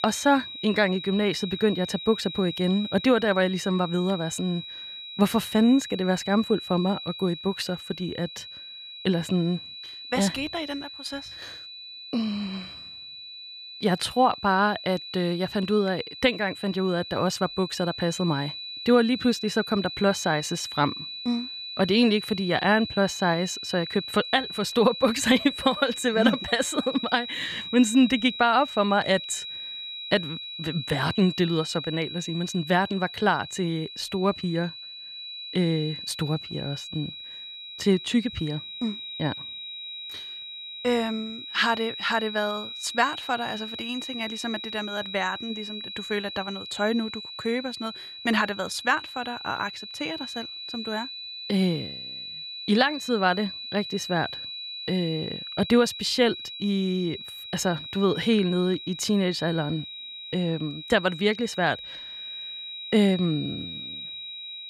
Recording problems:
high-pitched whine; loud; throughout; 4 kHz, 9 dB below the speech

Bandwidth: 14.5 kHz